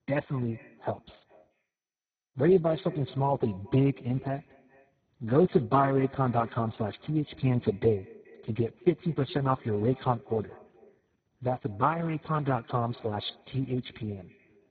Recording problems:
garbled, watery; badly; nothing above 4 kHz
echo of what is said; faint; throughout; 210 ms later, 20 dB below the speech

